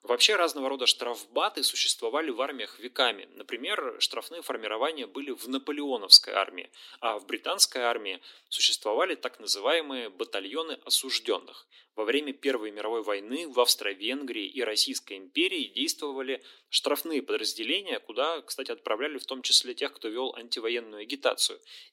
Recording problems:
thin; somewhat; fading below 250 Hz

